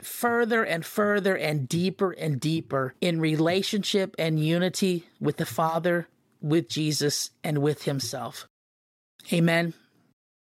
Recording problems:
none

